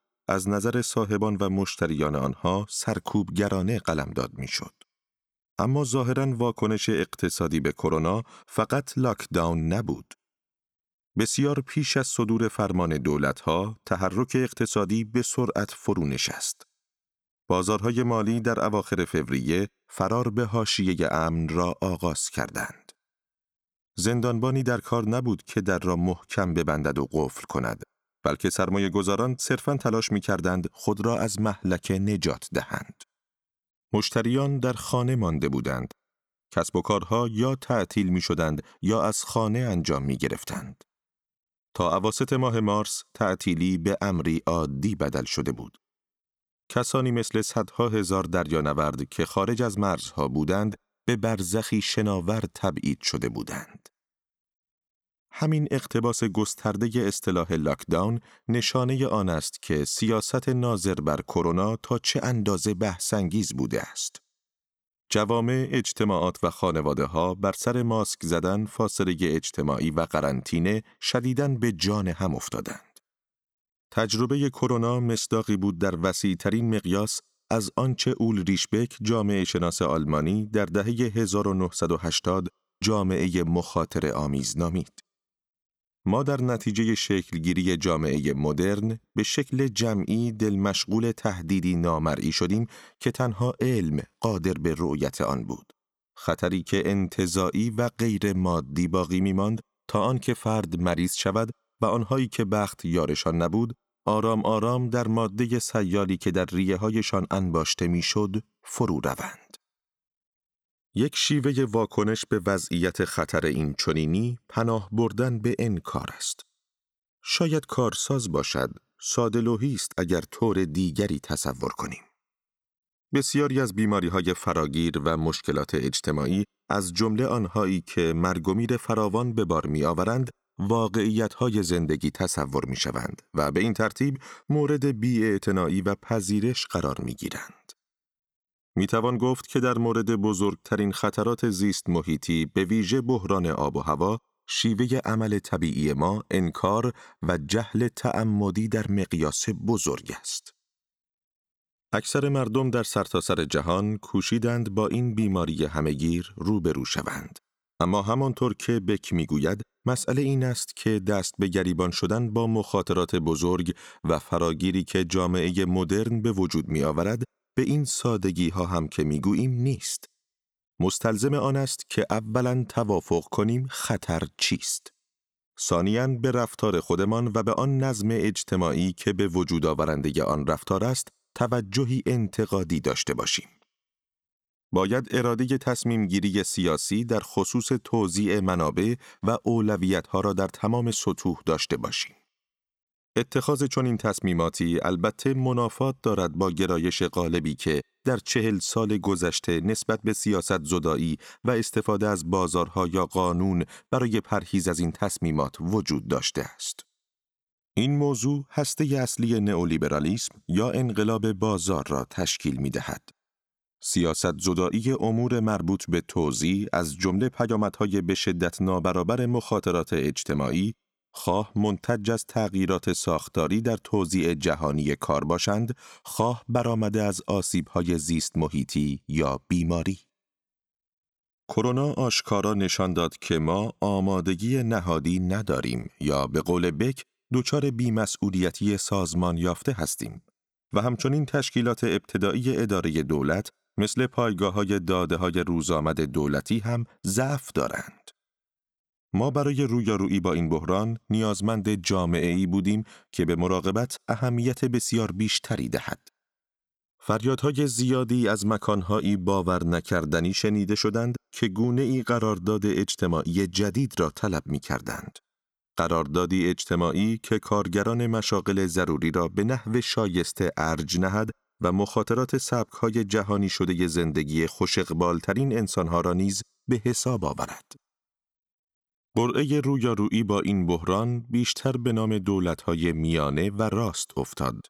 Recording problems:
none

